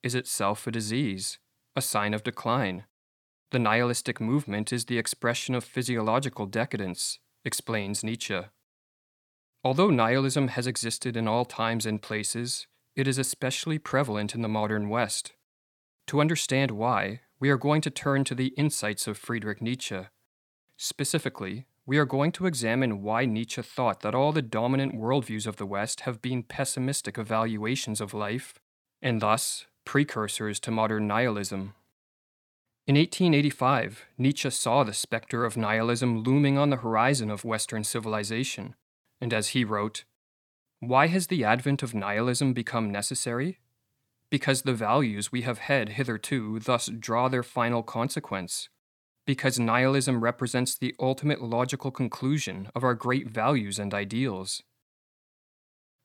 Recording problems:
none

